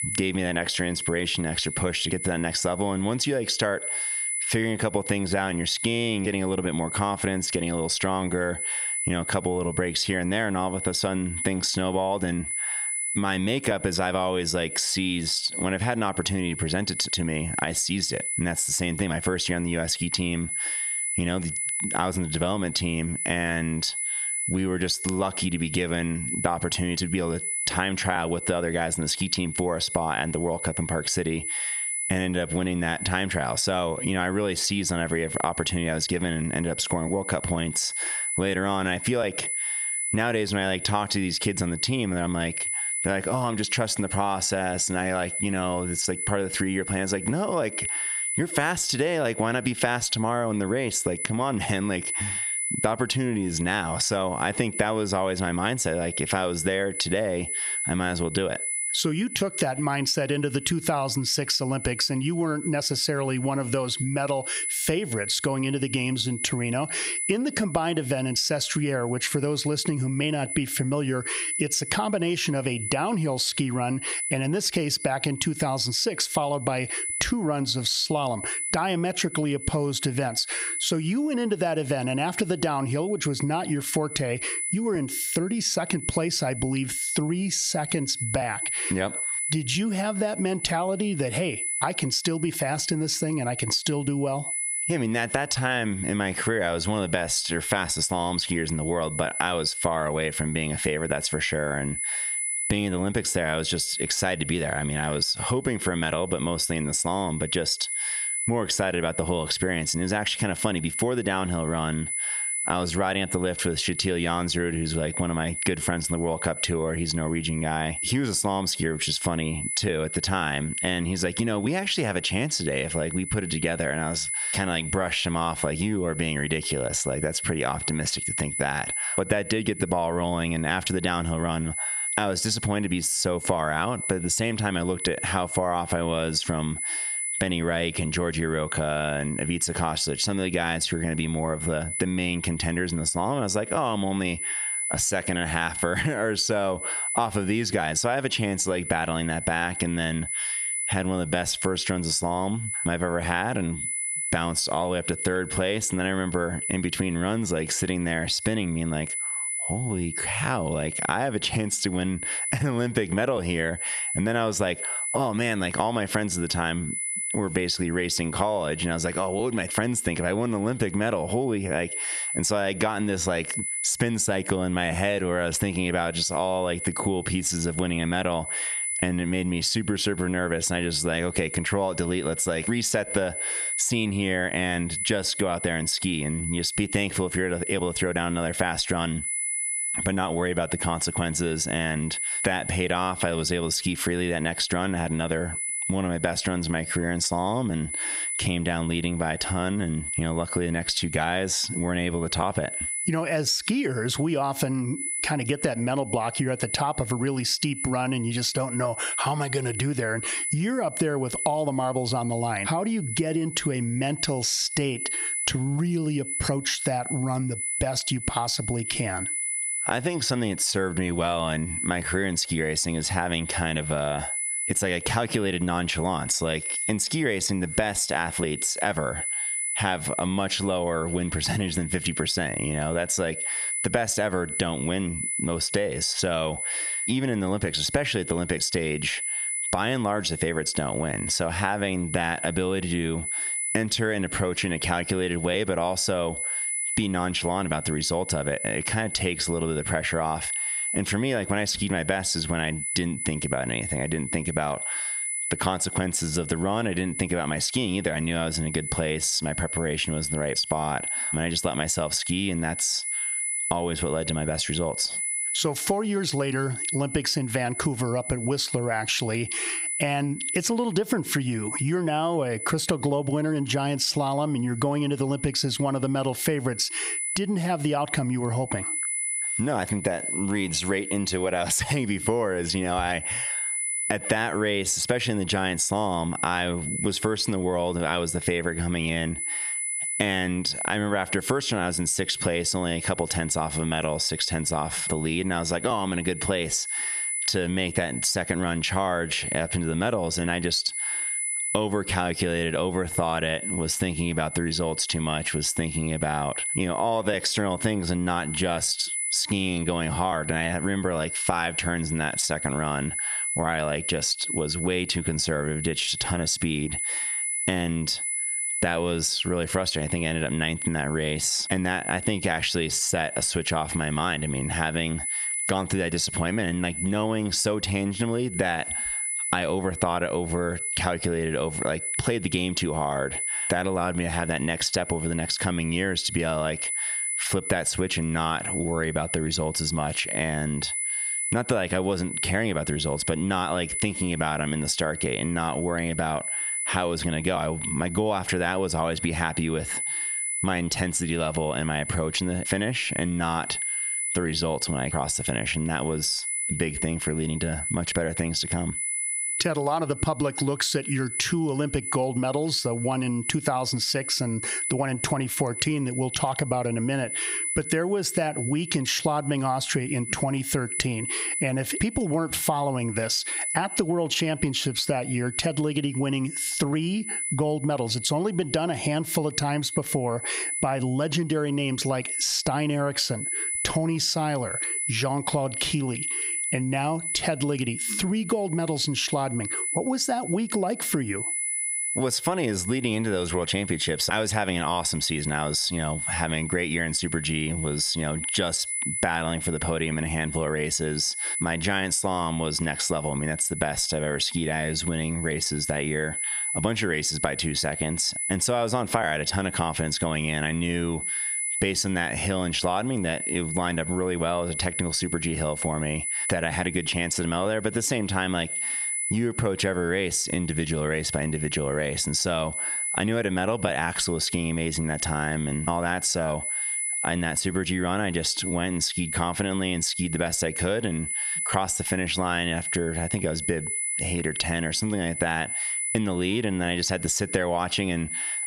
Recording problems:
squashed, flat; heavily
high-pitched whine; loud; throughout; 10 kHz, 6 dB below the speech

